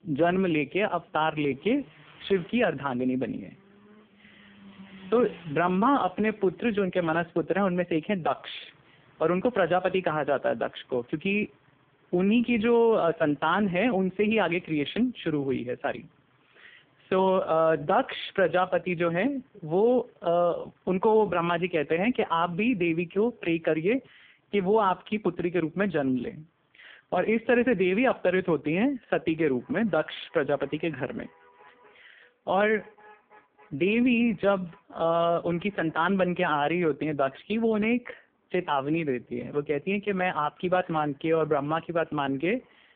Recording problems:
phone-call audio; poor line
traffic noise; faint; throughout; 30 dB below the speech

